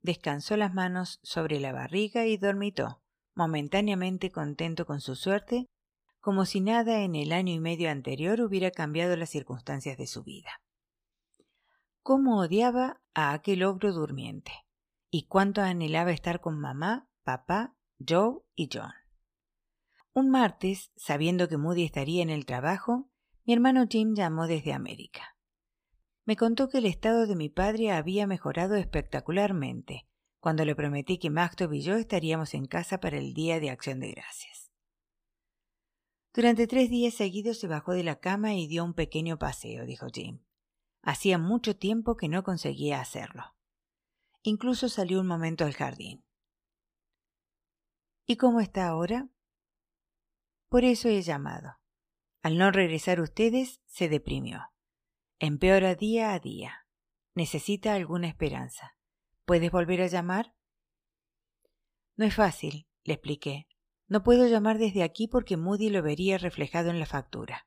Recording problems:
none

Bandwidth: 15 kHz